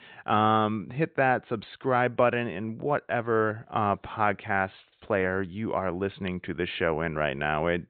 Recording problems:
high frequencies cut off; severe; nothing above 4 kHz

